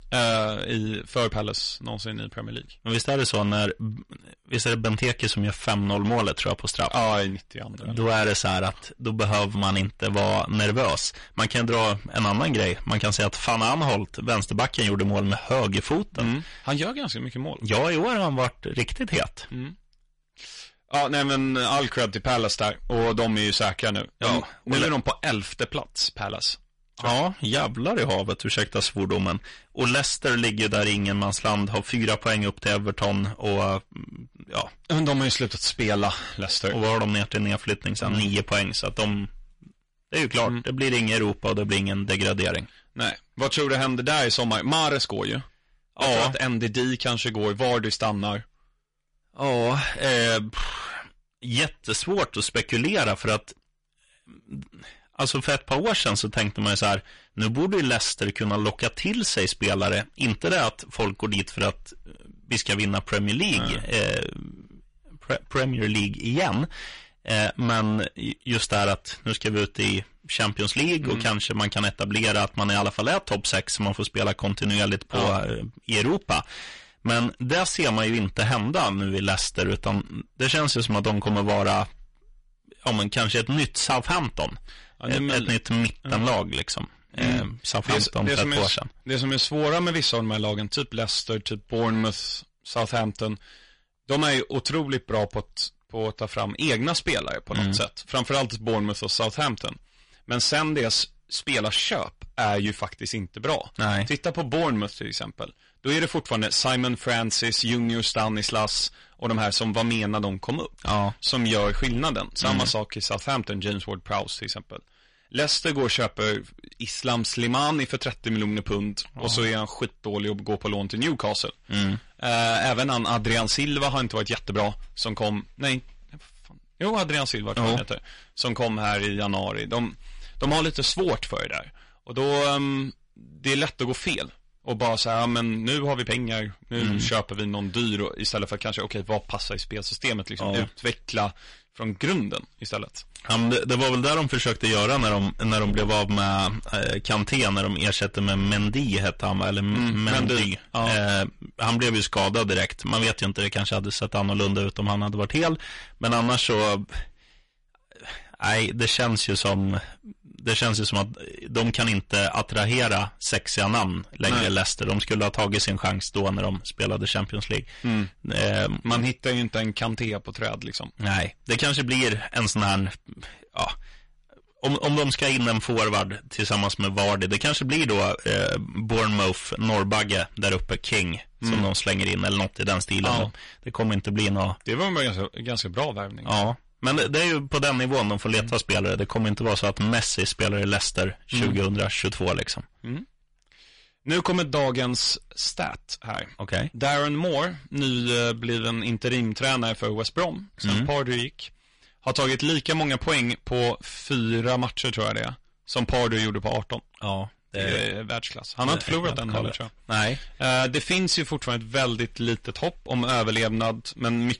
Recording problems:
distortion; heavy; 12% of the sound clipped
garbled, watery; slightly; nothing above 10.5 kHz

